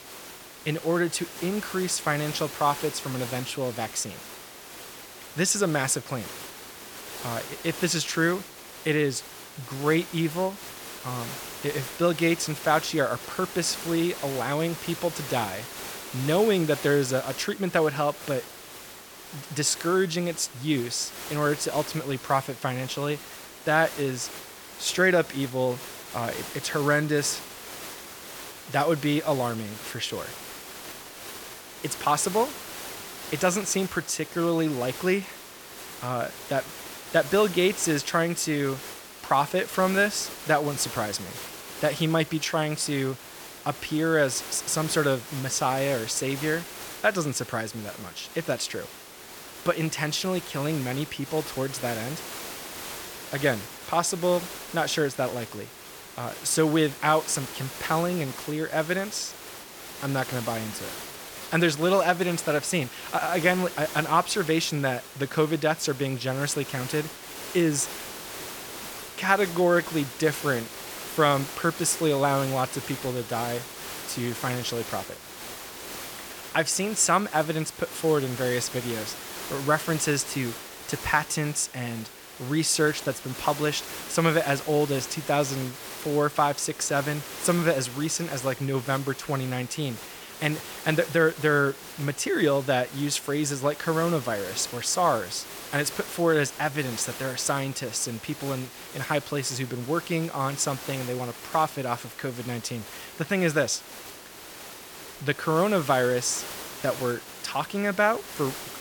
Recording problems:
hiss; noticeable; throughout; 10 dB below the speech

